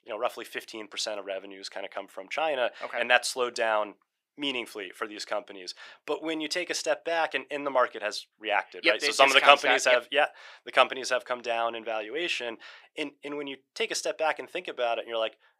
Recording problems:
thin; very; fading below 400 Hz

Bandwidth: 15.5 kHz